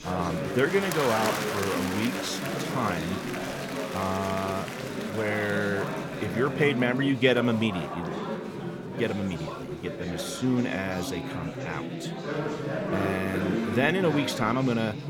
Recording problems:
chatter from many people; loud; throughout; 4 dB below the speech

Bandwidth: 17 kHz